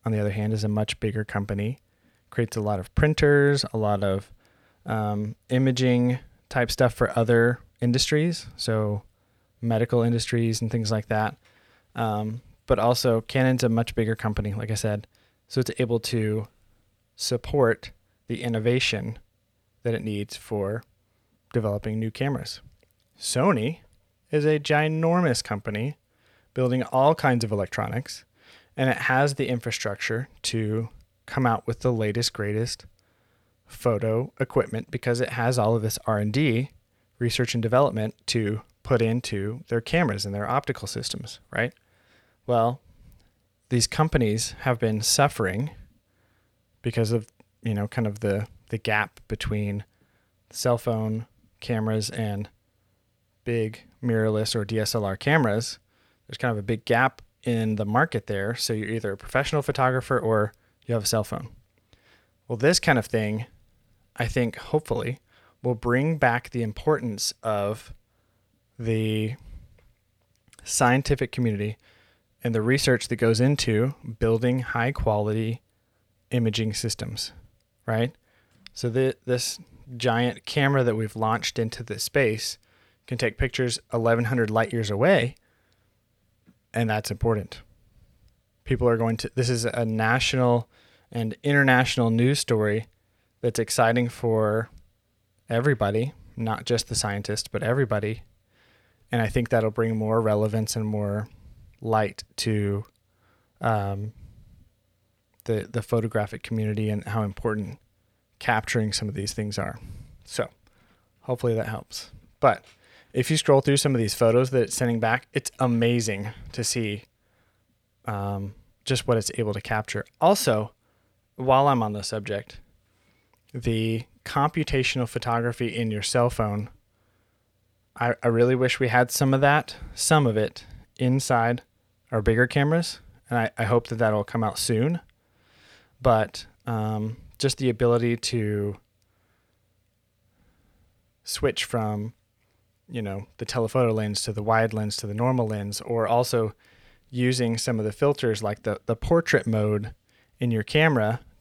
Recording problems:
none

